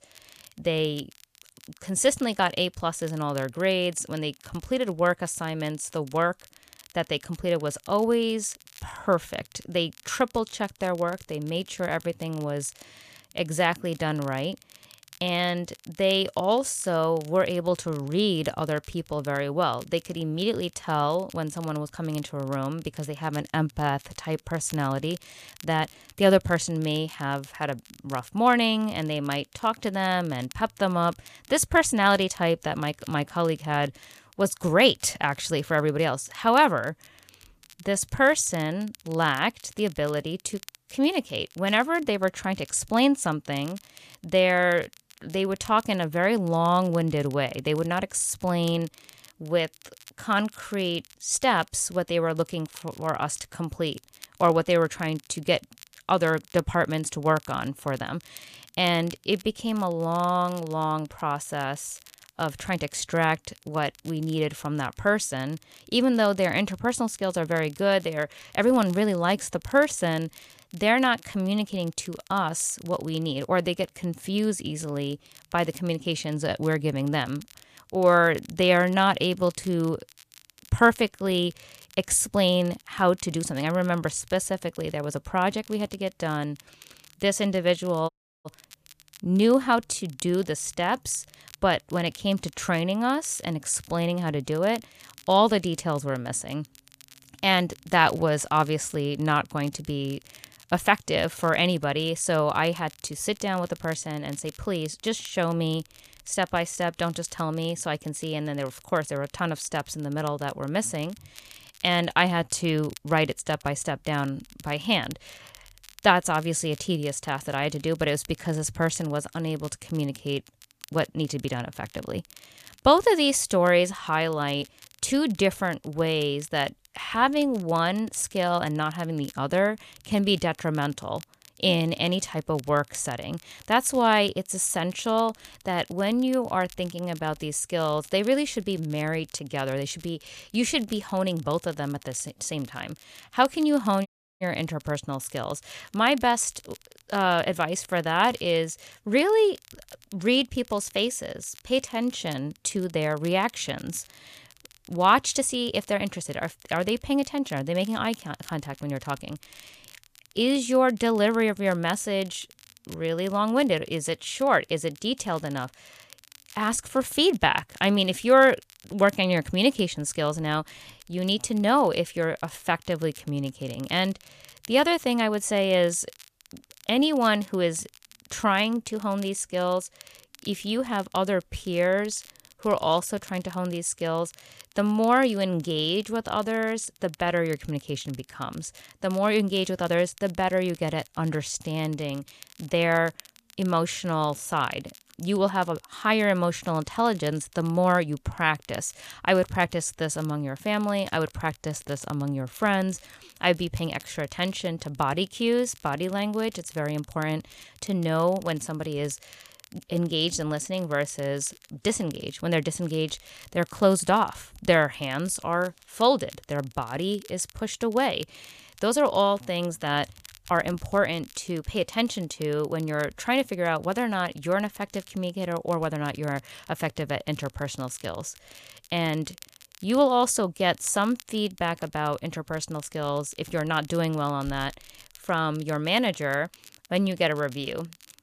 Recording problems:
crackle, like an old record; faint; 25 dB below the speech
audio cutting out; at 1:28 and at 2:24

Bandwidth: 14.5 kHz